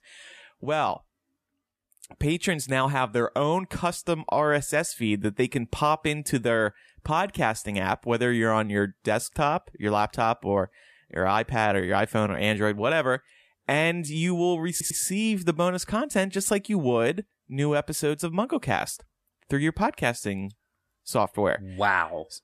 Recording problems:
audio stuttering; at 15 s

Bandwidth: 14.5 kHz